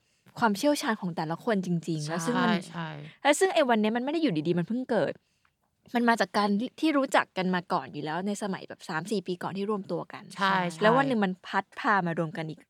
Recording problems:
none

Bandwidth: 18.5 kHz